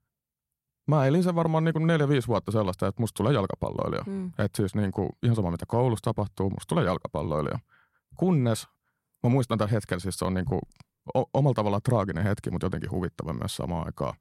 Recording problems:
none

